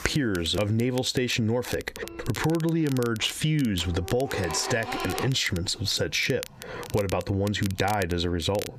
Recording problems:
squashed, flat; heavily, background pumping
household noises; noticeable; throughout; 10 dB below the speech
crackle, like an old record; noticeable; 15 dB below the speech

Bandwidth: 14.5 kHz